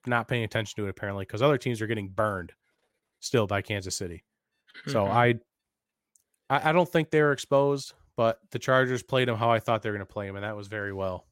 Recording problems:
none

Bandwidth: 16 kHz